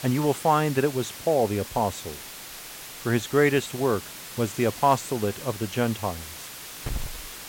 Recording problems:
hiss; noticeable; throughout; 10 dB below the speech

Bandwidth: 16.5 kHz